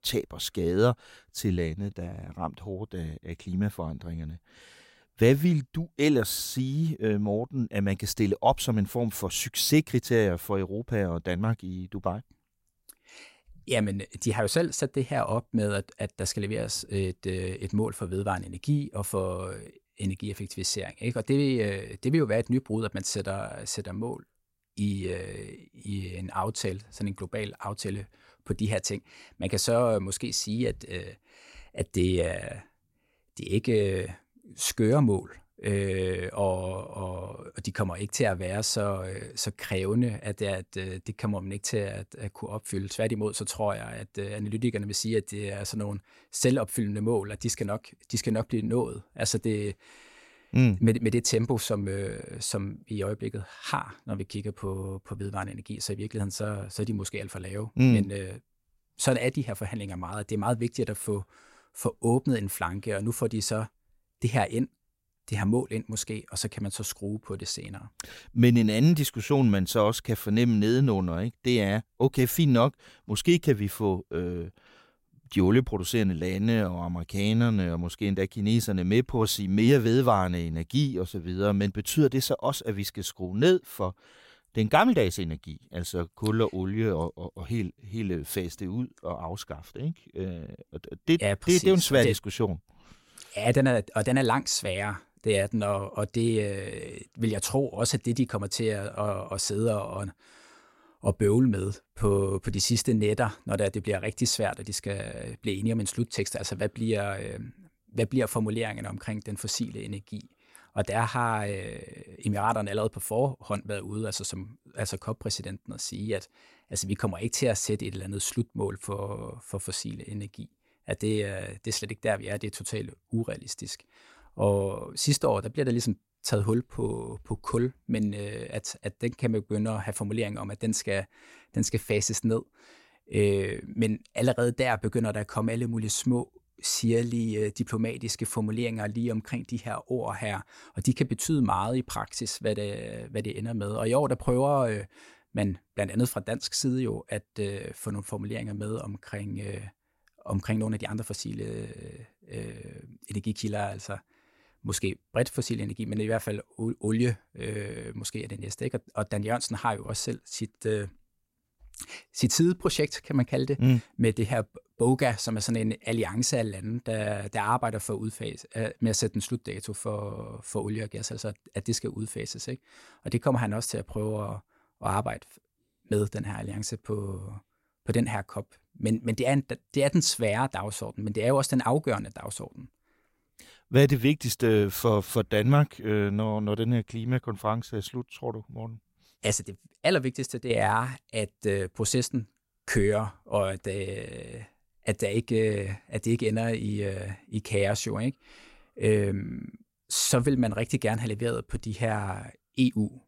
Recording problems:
none

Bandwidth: 16 kHz